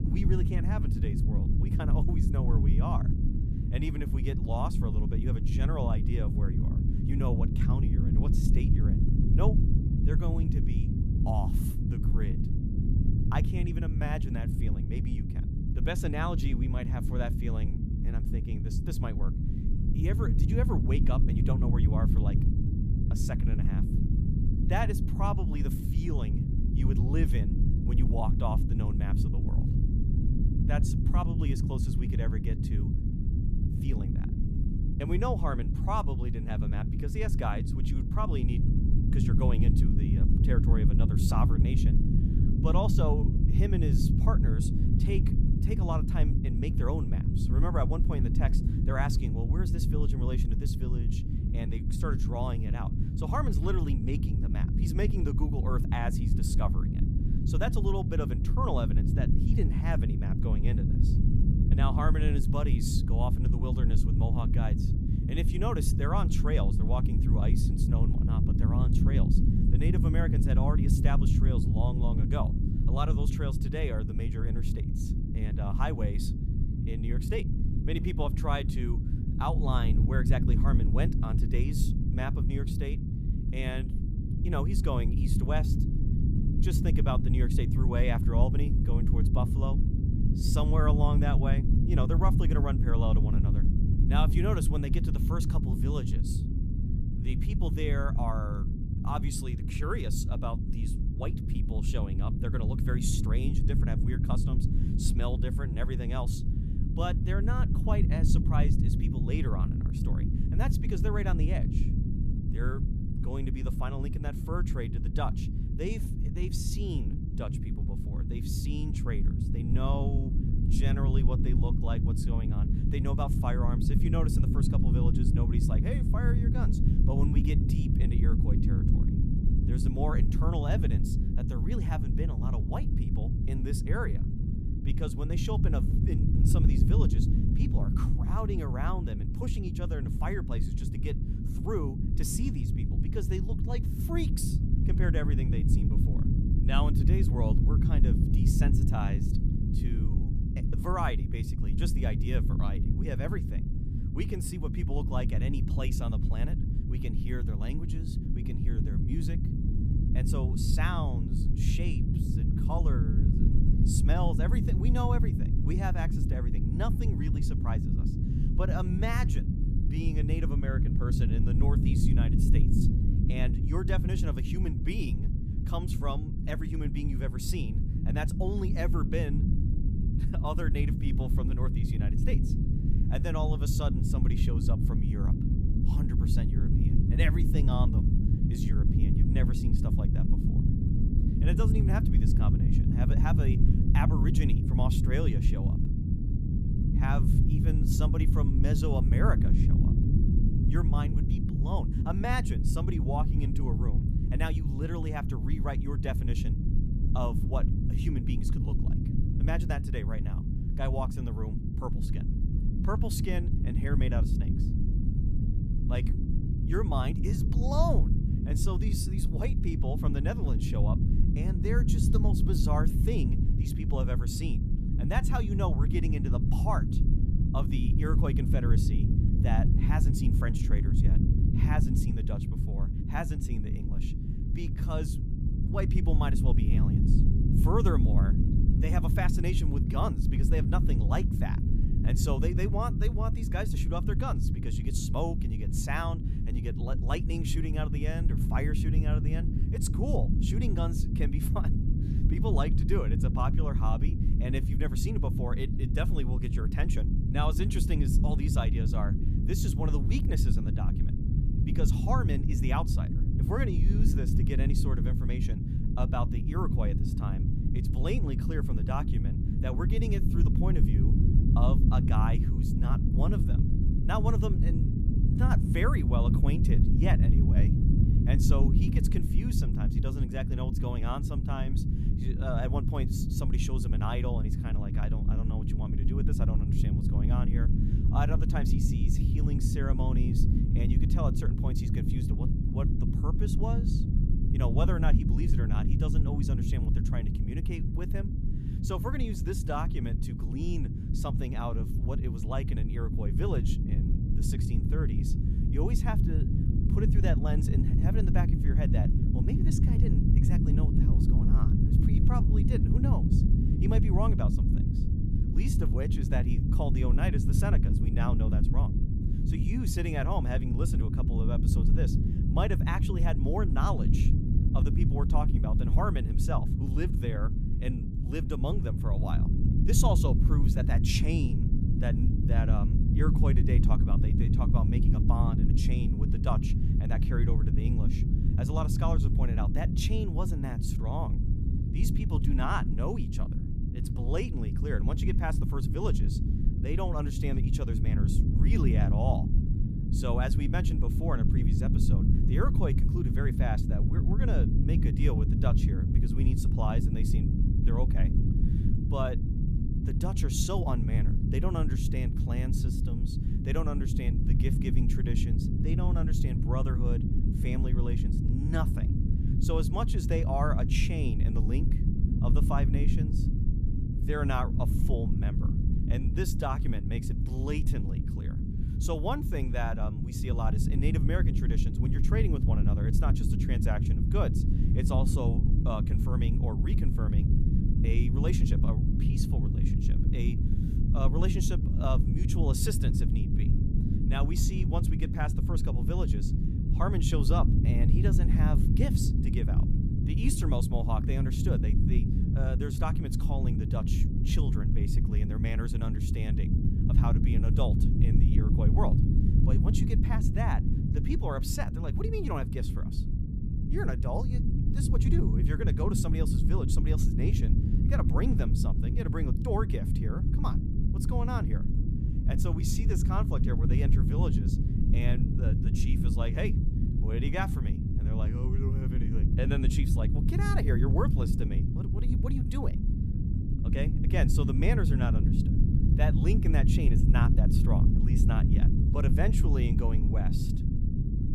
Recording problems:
low rumble; loud; throughout; 2 dB below the speech

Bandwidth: 14.5 kHz